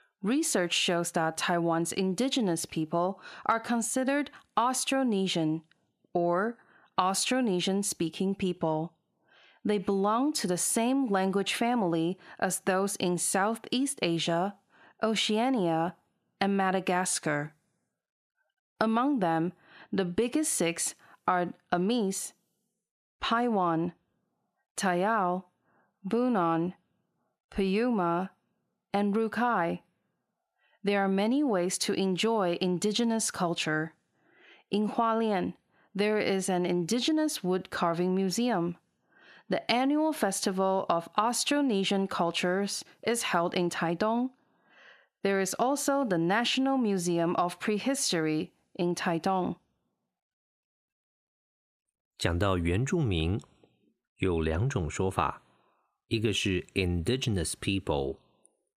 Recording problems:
squashed, flat; heavily

